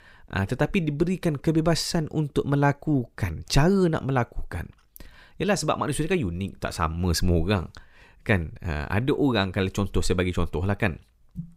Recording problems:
none

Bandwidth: 15.5 kHz